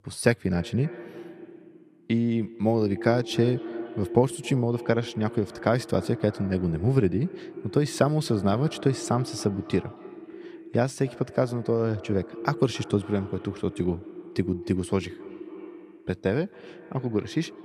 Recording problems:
echo of what is said; noticeable; throughout; 270 ms later, 15 dB below the speech

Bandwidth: 14.5 kHz